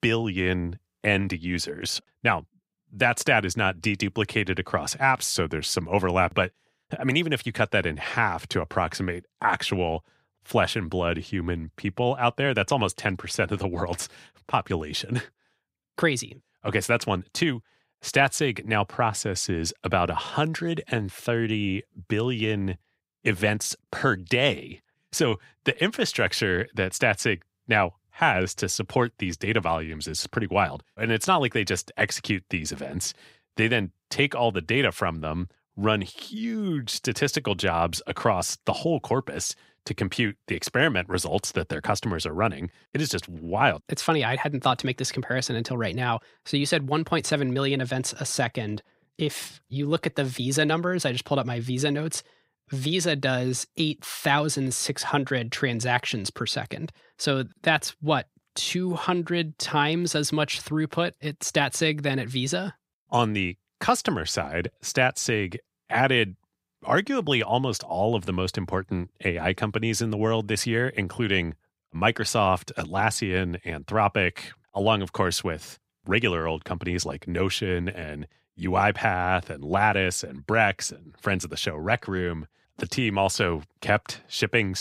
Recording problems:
abrupt cut into speech; at the end

